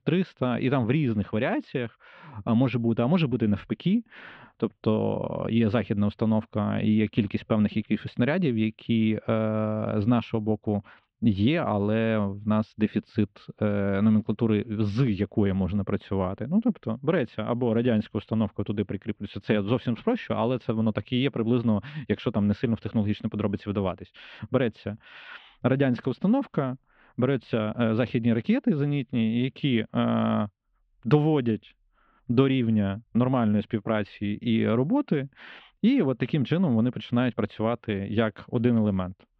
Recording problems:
muffled; very; fading above 3 kHz

